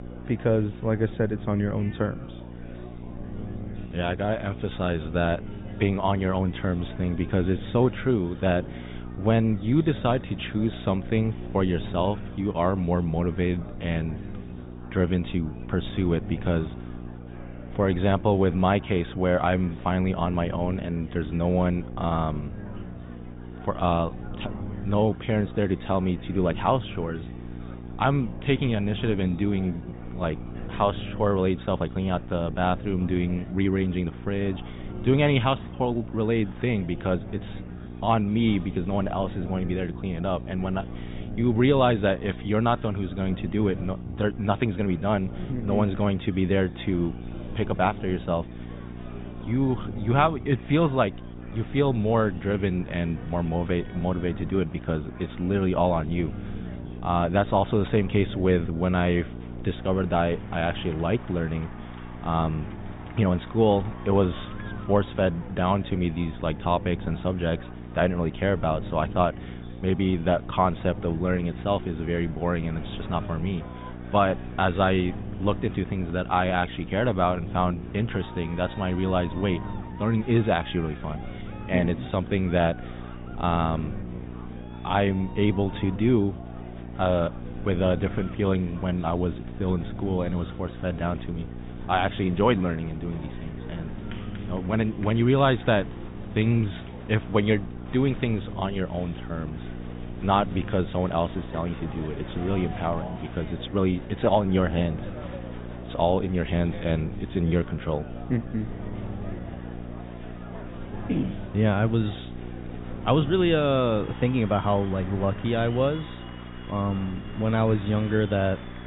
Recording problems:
high frequencies cut off; severe; nothing above 4 kHz
muffled; very slightly; fading above 3.5 kHz
electrical hum; noticeable; throughout; 60 Hz, 20 dB below the speech
murmuring crowd; noticeable; throughout; 20 dB below the speech

